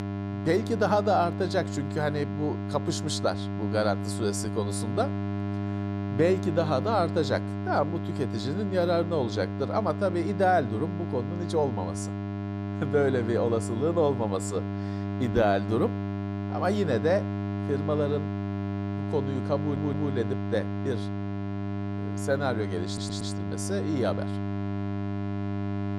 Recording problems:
electrical hum; loud; throughout; 50 Hz, 9 dB below the speech
audio stuttering; at 20 s and at 23 s

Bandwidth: 14.5 kHz